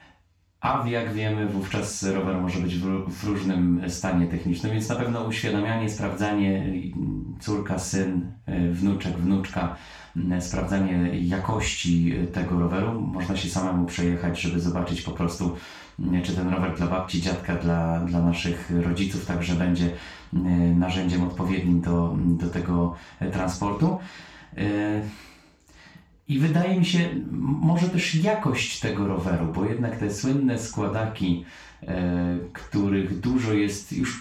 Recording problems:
off-mic speech; far
room echo; noticeable; dies away in 0.3 s

